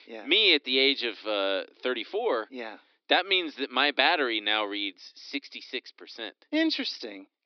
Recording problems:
high frequencies cut off; noticeable; nothing above 5.5 kHz
thin; very slightly; fading below 250 Hz

